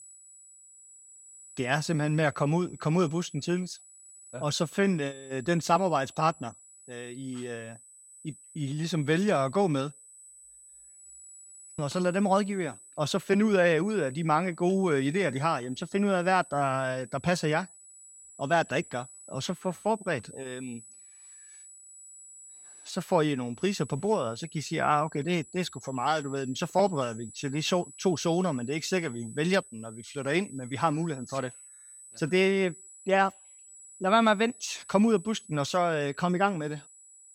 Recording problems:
high-pitched whine; noticeable; throughout; 8 kHz, 20 dB below the speech

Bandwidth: 16 kHz